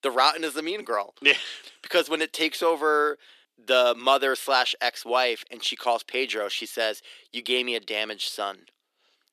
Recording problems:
thin; somewhat; fading below 300 Hz

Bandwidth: 14 kHz